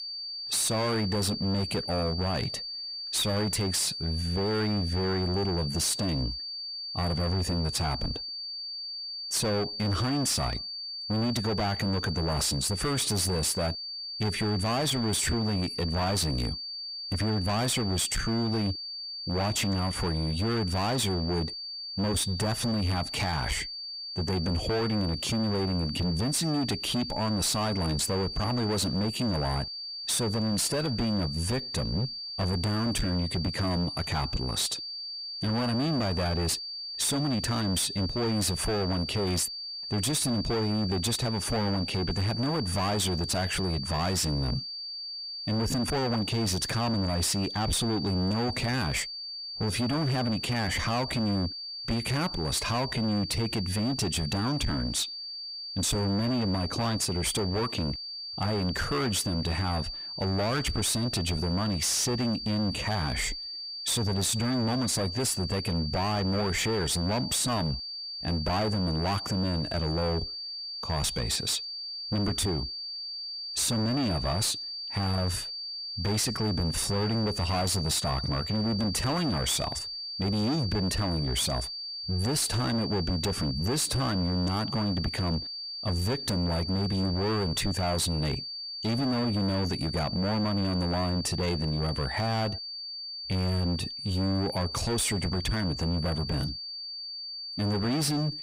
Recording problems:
distortion; heavy; 29% of the sound clipped
high-pitched whine; loud; throughout; 4.5 kHz, 6 dB below the speech

